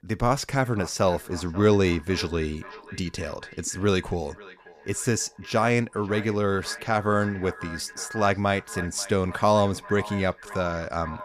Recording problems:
echo of what is said; noticeable; throughout; 540 ms later, 15 dB below the speech

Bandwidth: 14.5 kHz